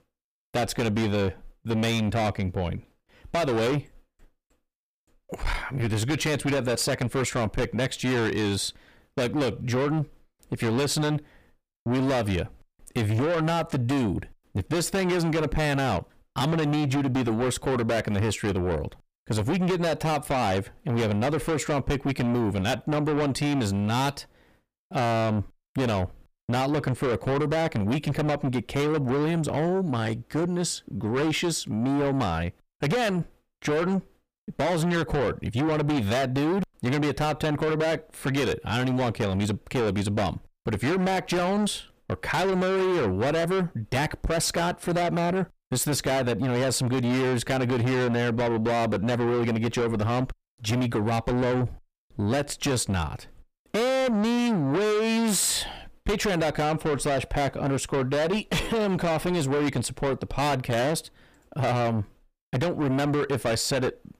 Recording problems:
distortion; heavy; 6 dB below the speech

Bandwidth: 15 kHz